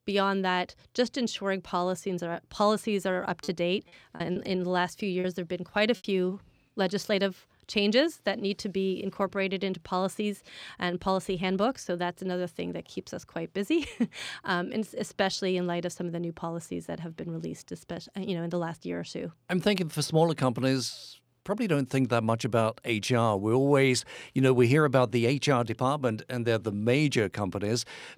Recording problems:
choppy; very; from 3.5 to 5 s; 8% of the speech affected

